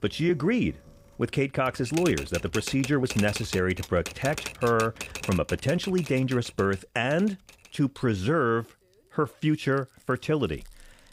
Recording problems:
household noises; noticeable; throughout; 10 dB below the speech

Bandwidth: 15.5 kHz